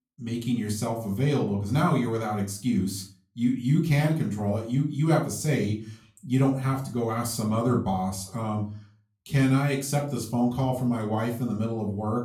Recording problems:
off-mic speech; far
room echo; slight; dies away in 0.3 s

